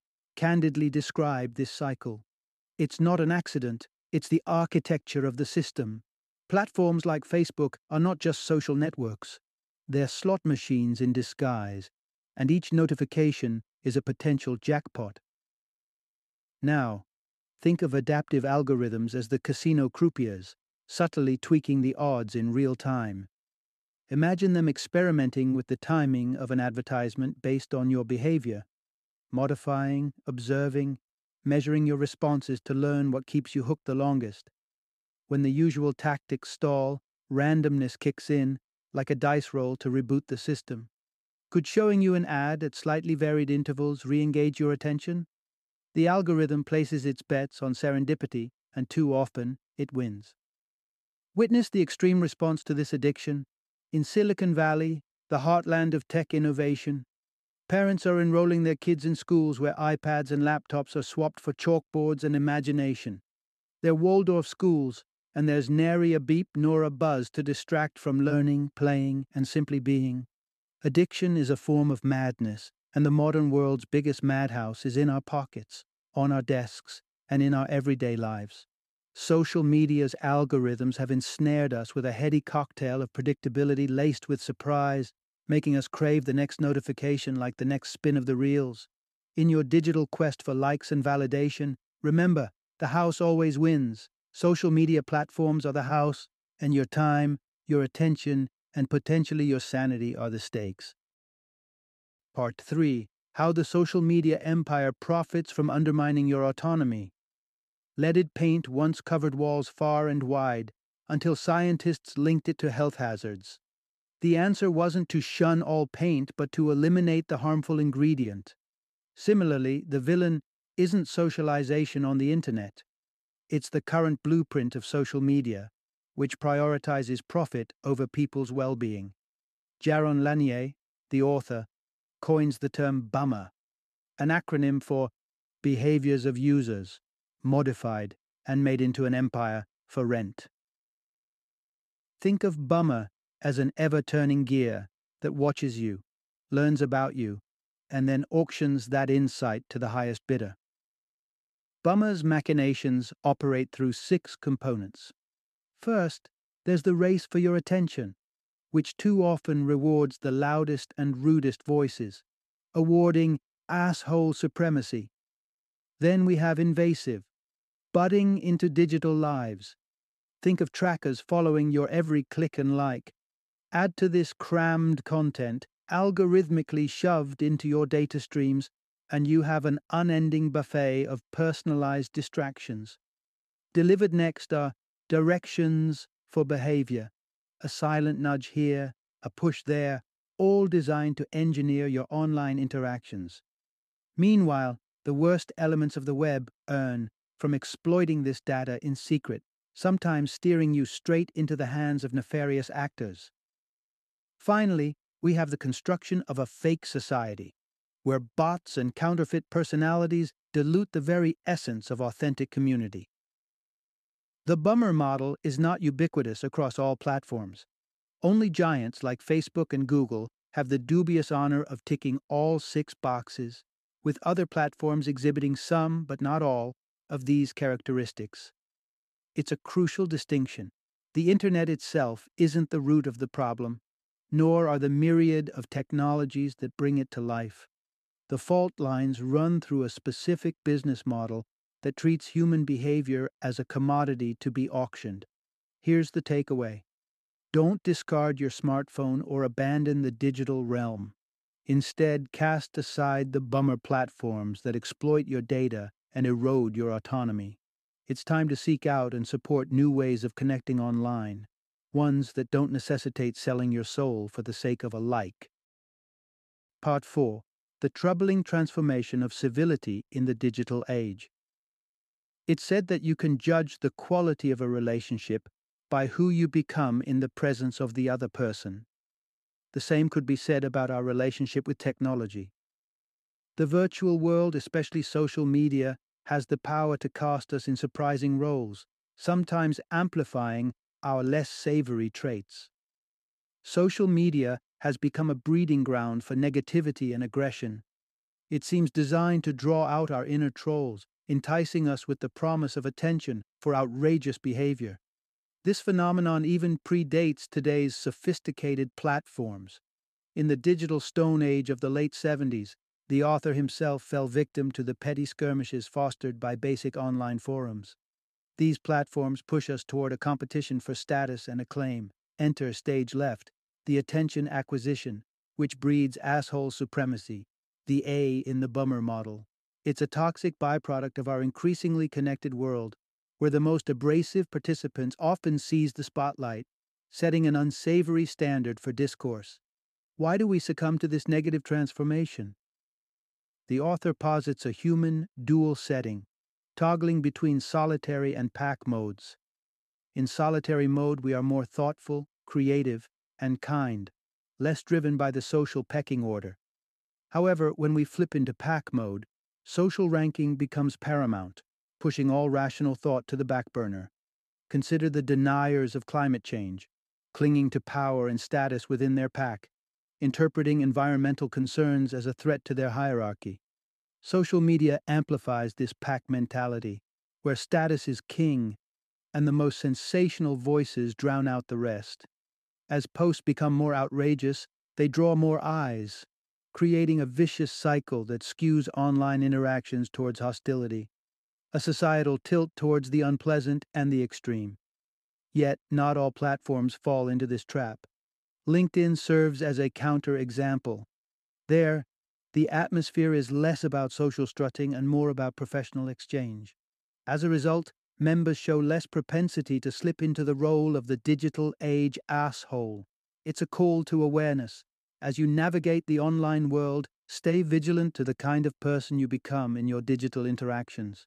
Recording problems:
none

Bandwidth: 13.5 kHz